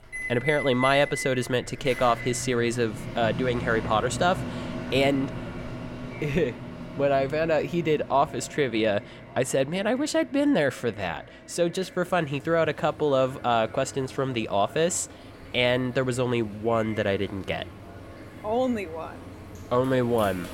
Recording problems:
echo of what is said; faint; throughout; 550 ms later, 25 dB below the speech
household noises; noticeable; throughout; 10 dB below the speech

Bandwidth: 16.5 kHz